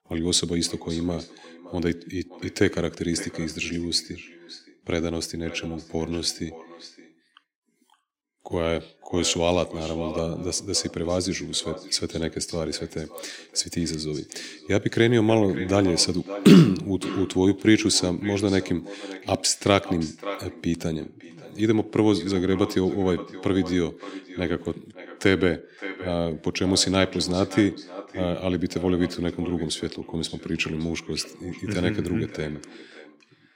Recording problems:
echo of what is said; noticeable; throughout; 570 ms later, 15 dB below the speech

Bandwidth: 16 kHz